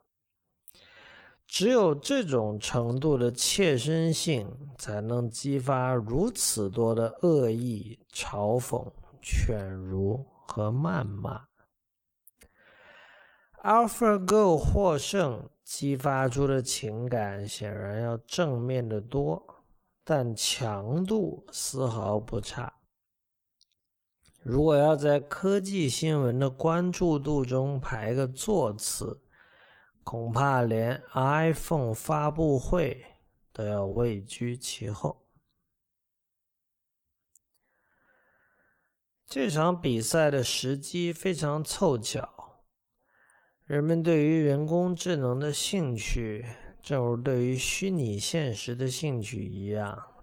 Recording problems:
wrong speed, natural pitch; too slow; 0.6 times normal speed

